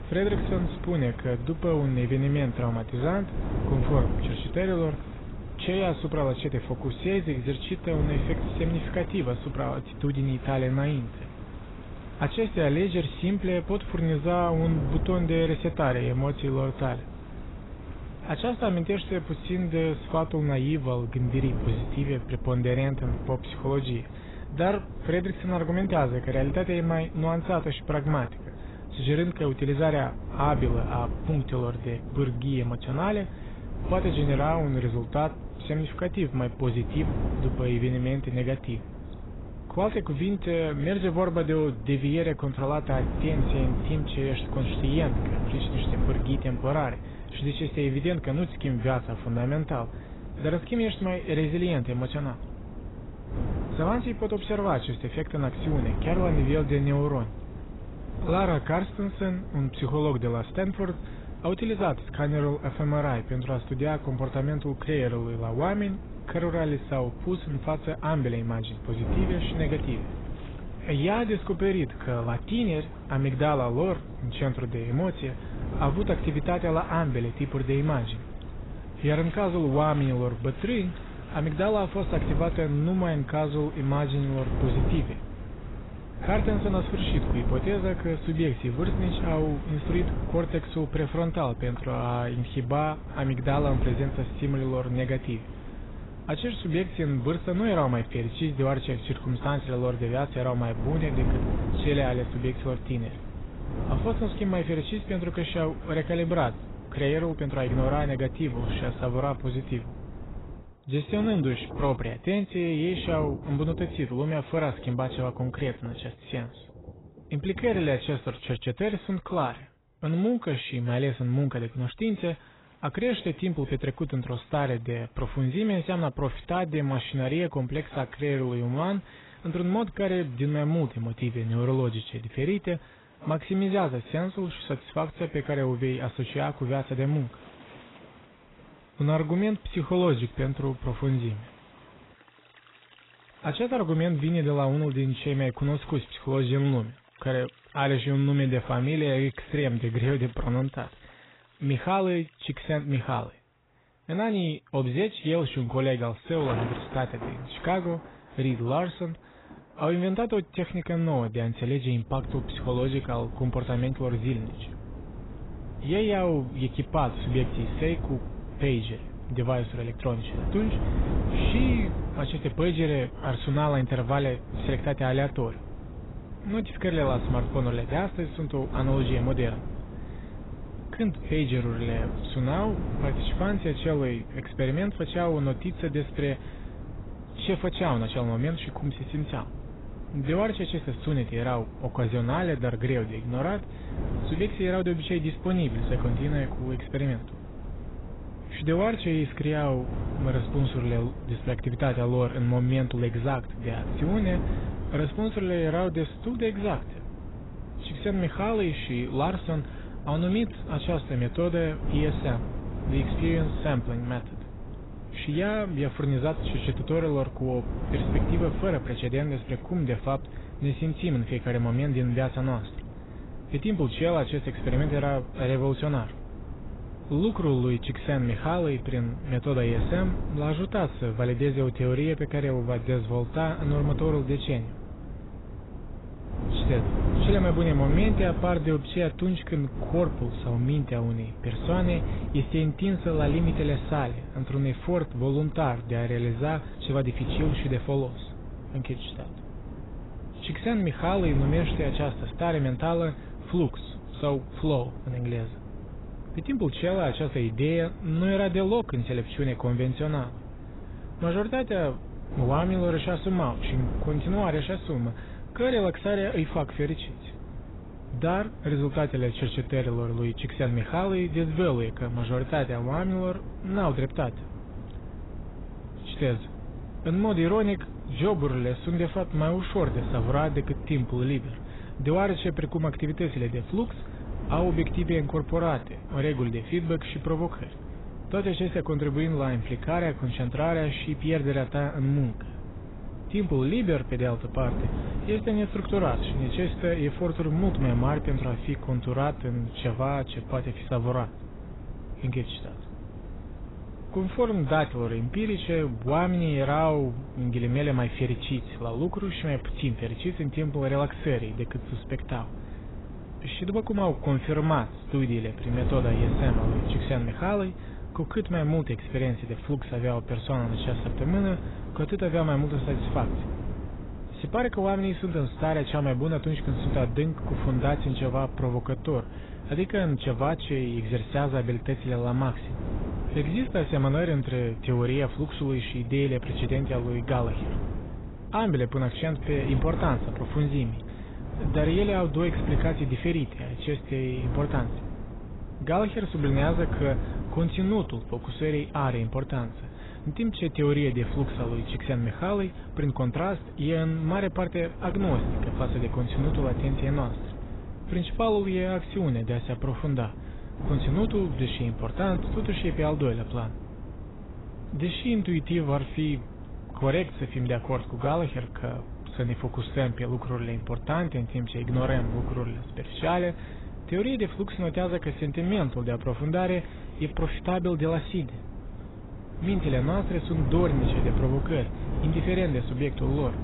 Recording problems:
garbled, watery; badly; nothing above 4 kHz
wind noise on the microphone; occasional gusts; until 1:51 and from 2:42 on; 15 dB below the speech
rain or running water; faint; throughout; 20 dB below the speech

